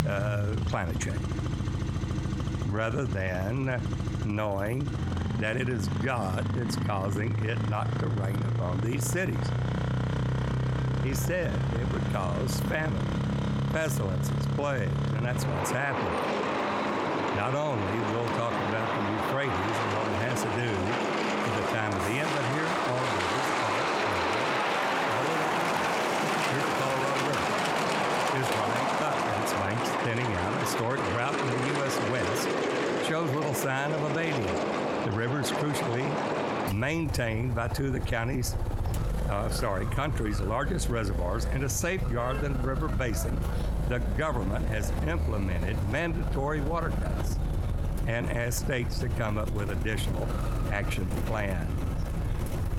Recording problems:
squashed, flat; somewhat
traffic noise; very loud; throughout; 2 dB above the speech

